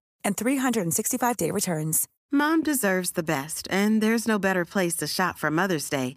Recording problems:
none

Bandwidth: 15 kHz